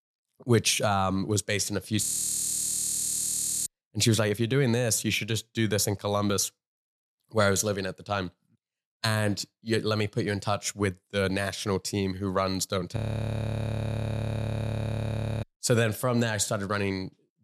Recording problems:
audio freezing; at 2 s for 1.5 s and at 13 s for 2.5 s

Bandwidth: 13.5 kHz